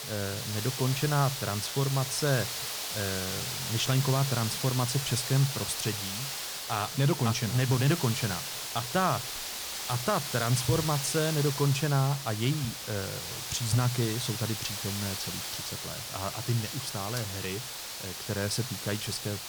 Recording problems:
hiss; loud; throughout; 4 dB below the speech
rain or running water; faint; throughout; 20 dB below the speech

